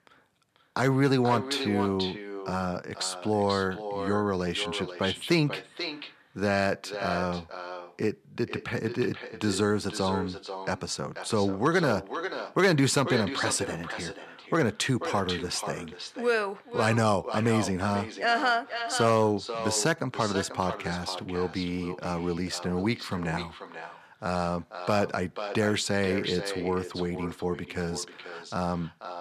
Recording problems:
echo of what is said; strong; throughout; 490 ms later, 9 dB below the speech

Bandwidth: 14 kHz